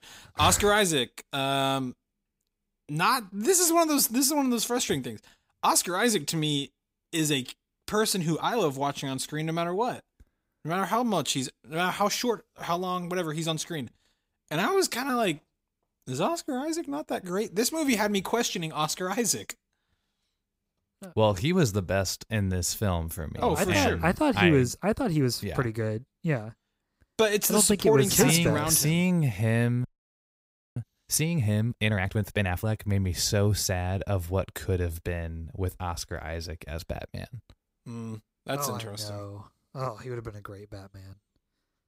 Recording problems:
audio freezing; at 30 s for 1 s

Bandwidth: 15.5 kHz